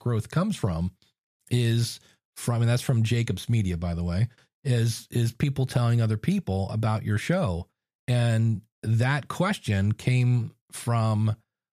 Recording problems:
none

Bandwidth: 14.5 kHz